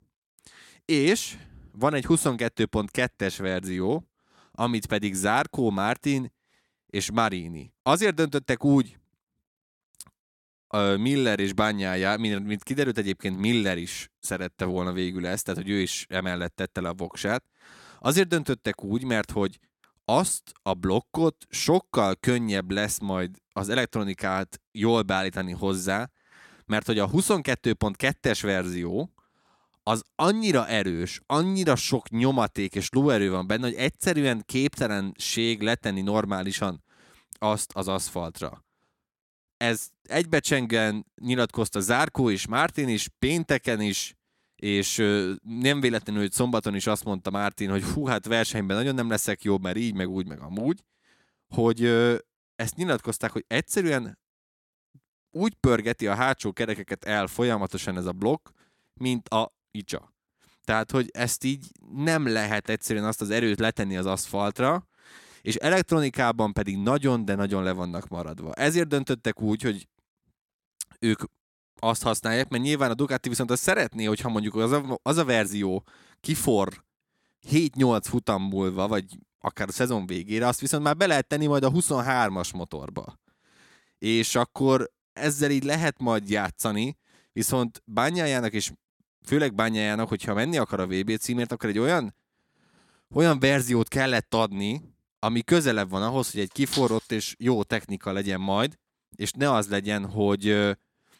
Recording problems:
none

